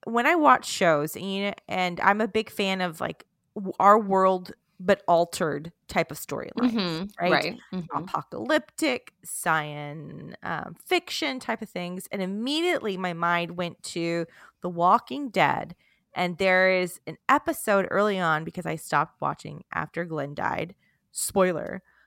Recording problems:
audio stuttering; at 10 s

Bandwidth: 16 kHz